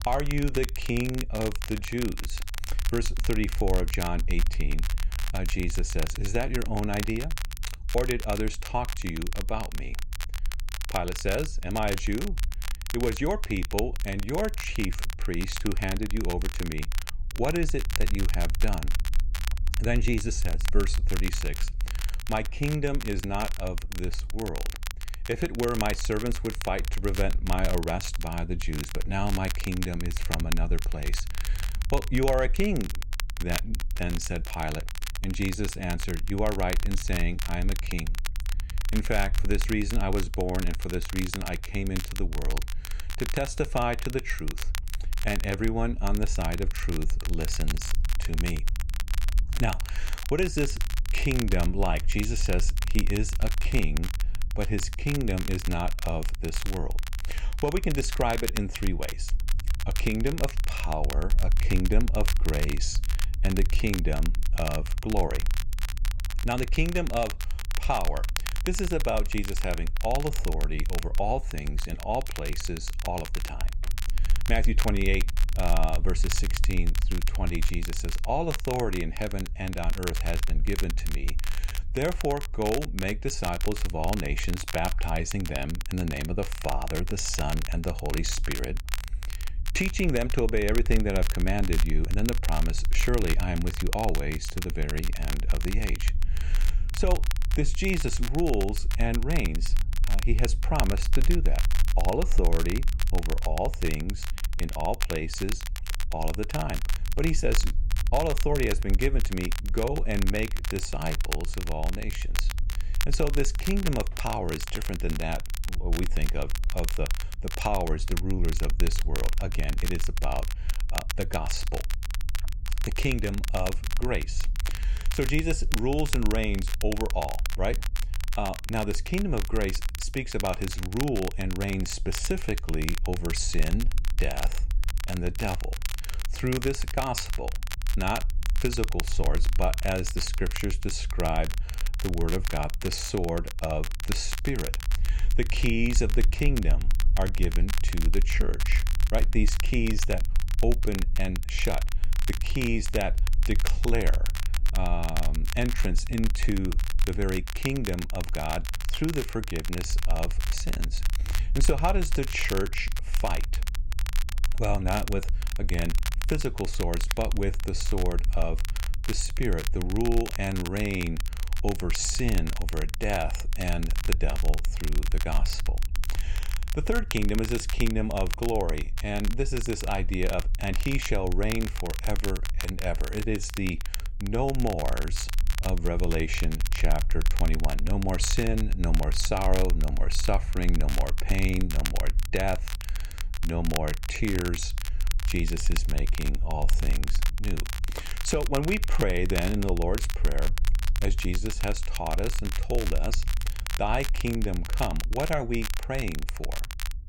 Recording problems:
crackle, like an old record; loud; 8 dB below the speech
low rumble; faint; throughout; 25 dB below the speech

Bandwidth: 16 kHz